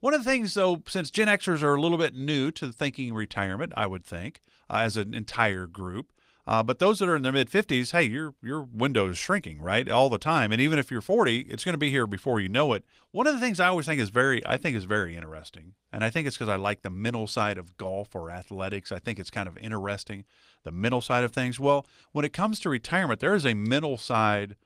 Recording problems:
garbled, watery; slightly; nothing above 15.5 kHz

